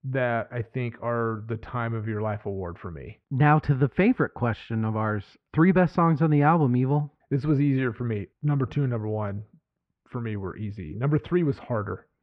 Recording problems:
muffled; very; fading above 2 kHz

